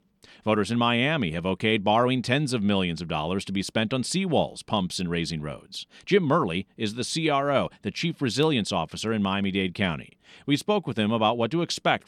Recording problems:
none

